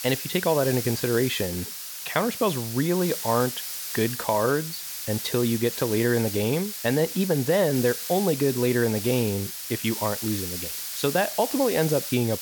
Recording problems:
hiss; loud; throughout; 6 dB below the speech

